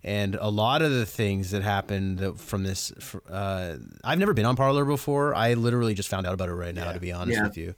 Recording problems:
uneven, jittery; strongly; from 1 to 6.5 s

